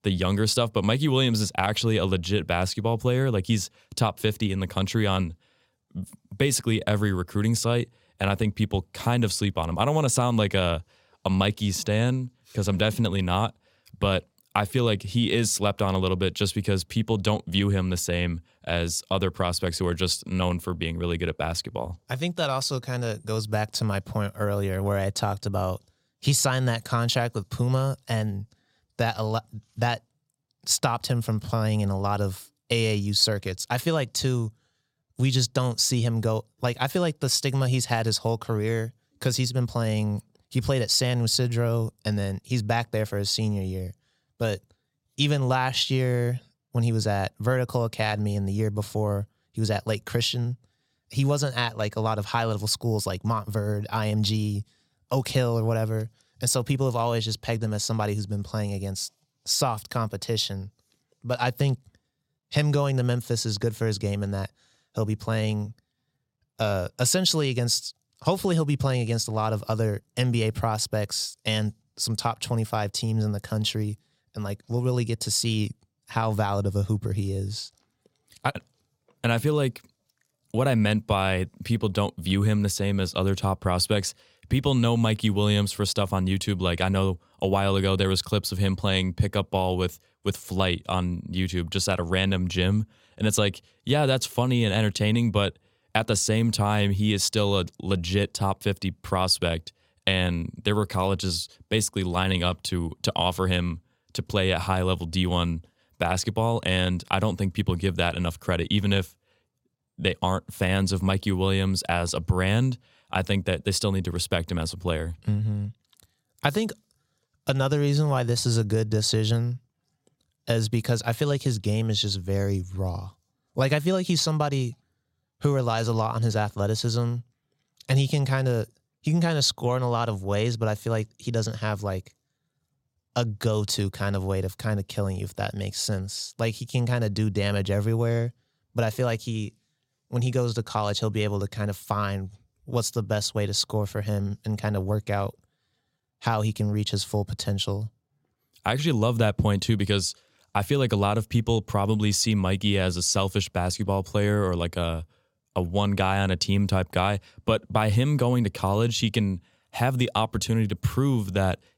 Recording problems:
none

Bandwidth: 16.5 kHz